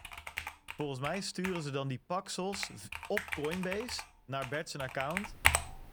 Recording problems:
household noises; very loud; throughout; 2 dB above the speech

